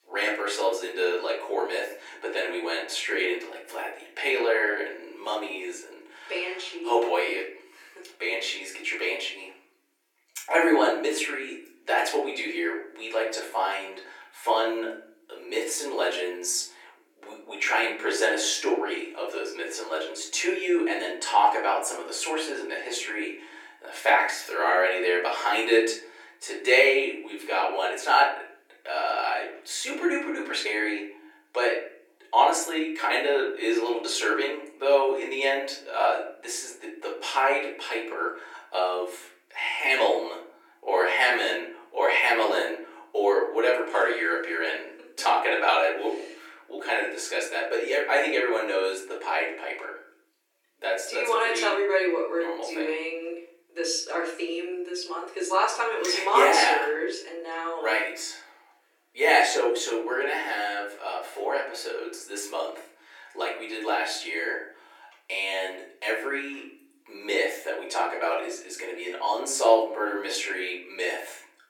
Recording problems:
off-mic speech; far
thin; very; fading below 300 Hz
room echo; slight; dies away in 0.6 s

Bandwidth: 17.5 kHz